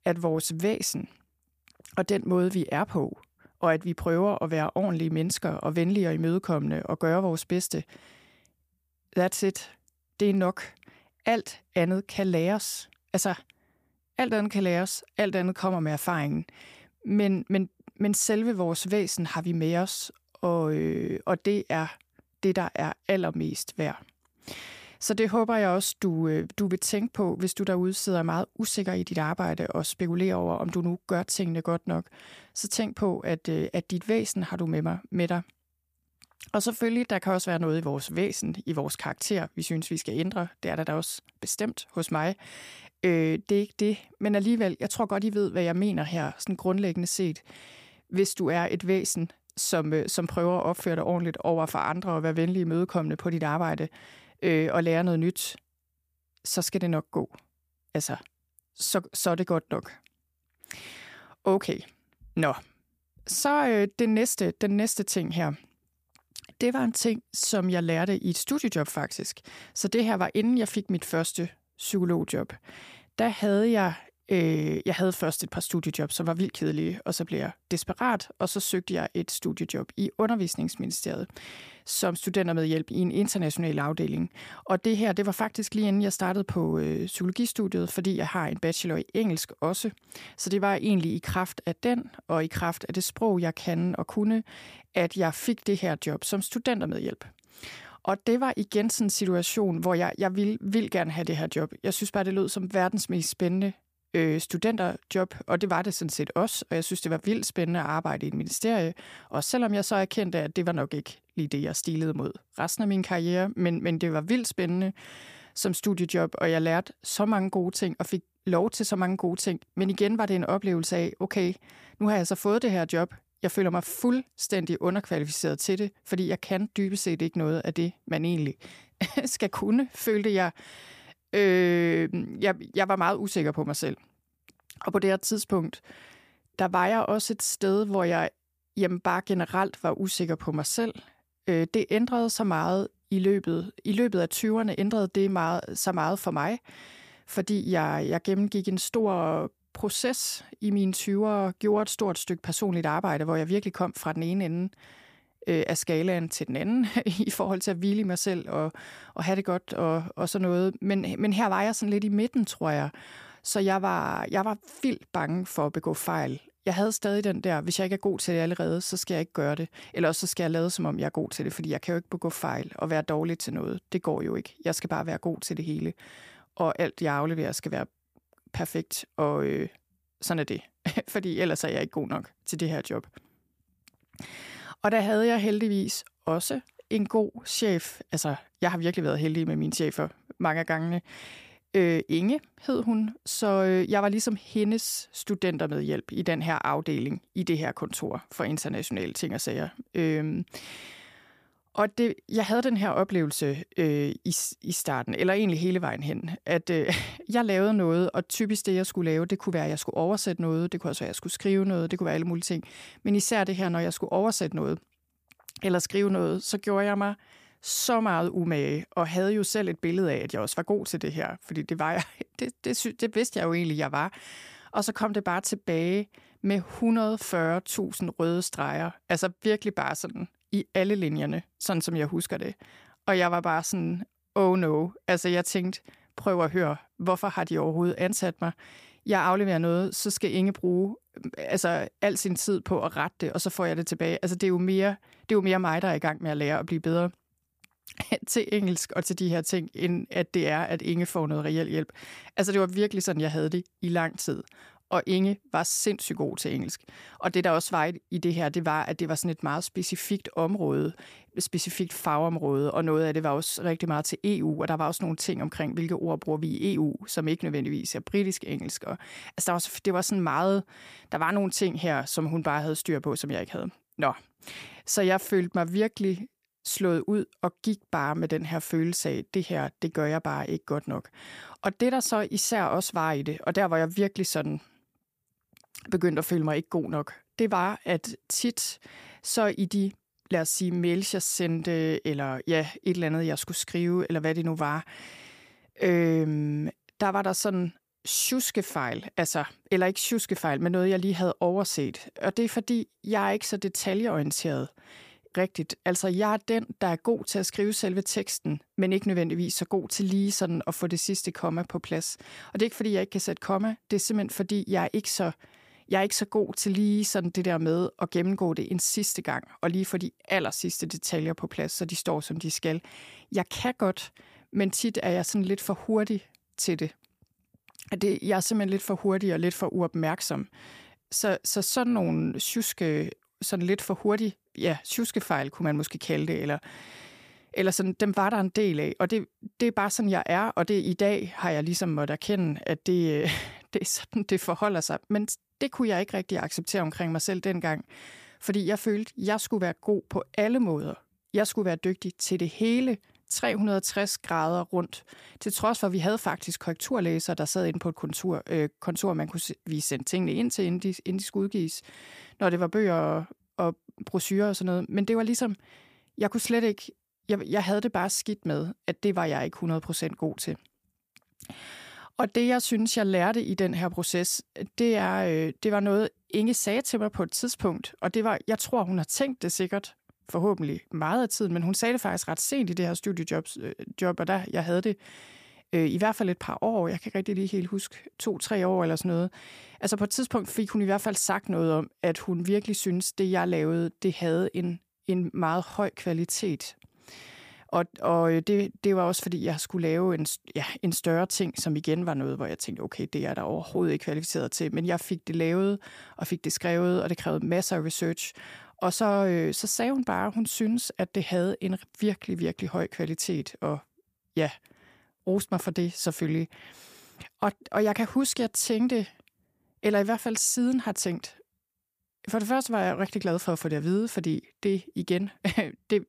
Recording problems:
none

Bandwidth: 15 kHz